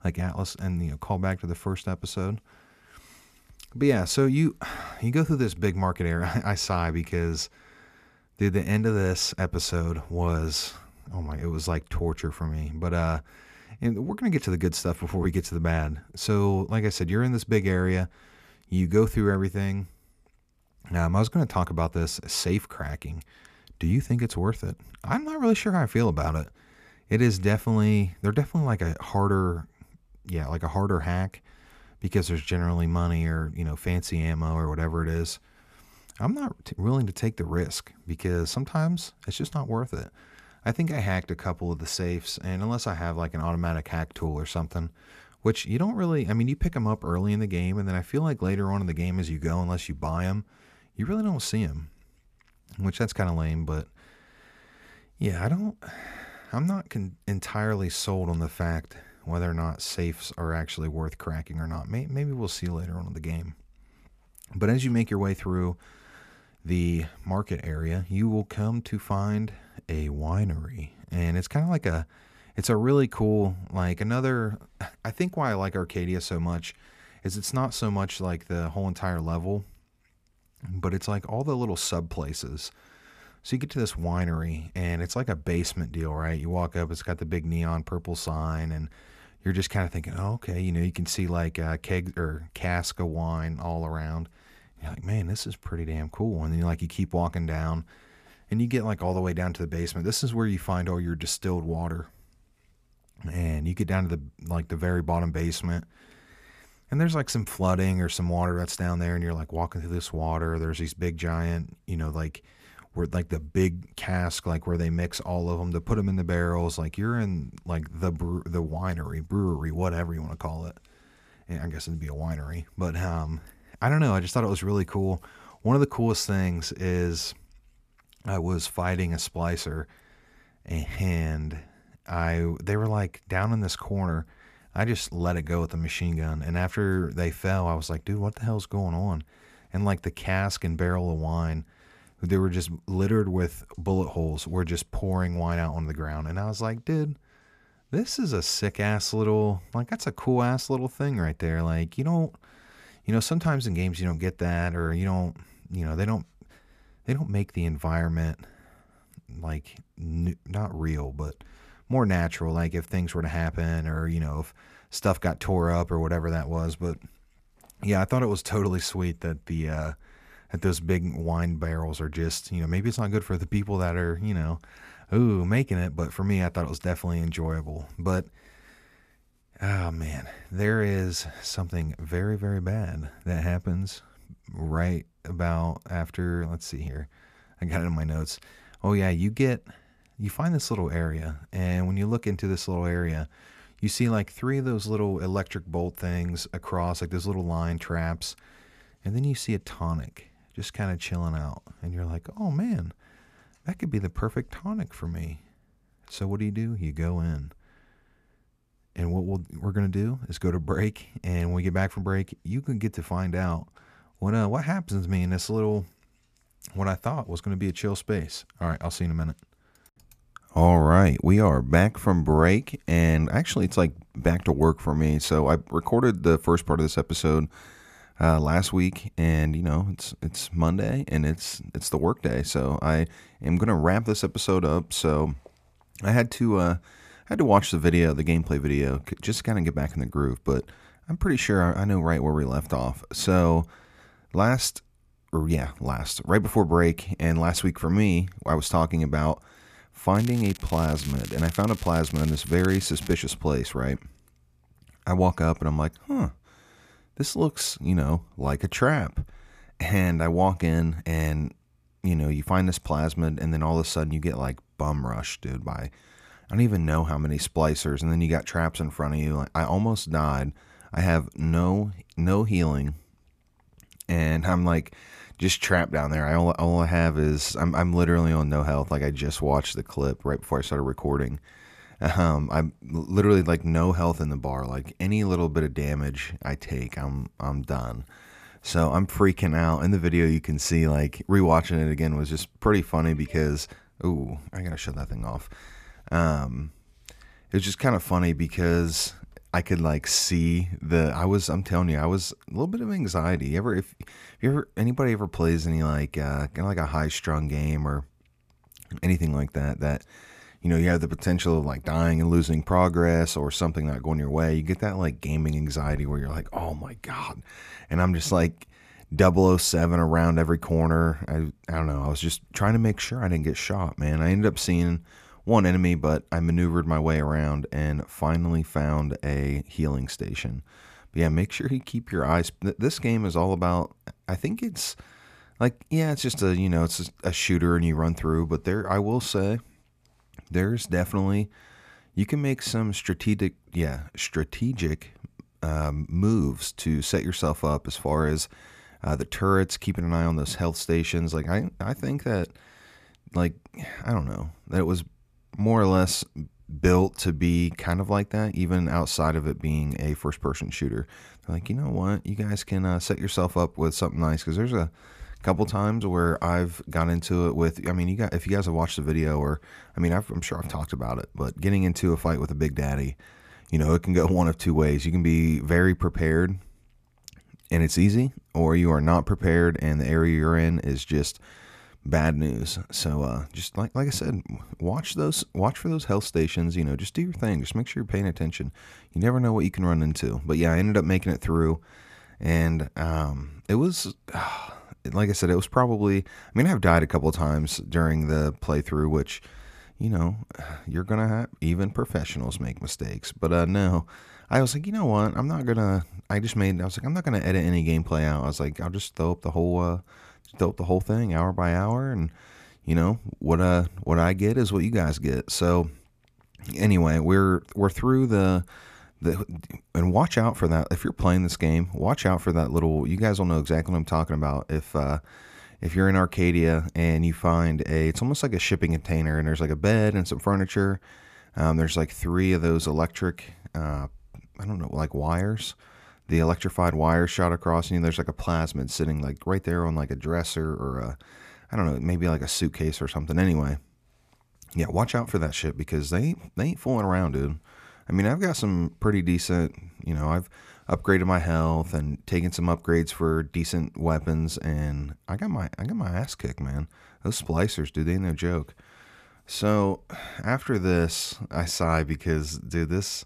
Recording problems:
crackling; noticeable; from 4:10 to 4:13; 15 dB below the speech

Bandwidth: 14.5 kHz